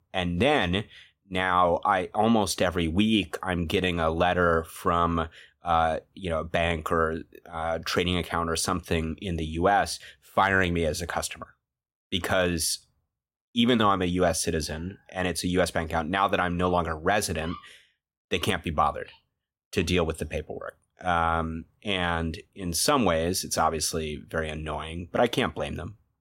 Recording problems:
none

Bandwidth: 16 kHz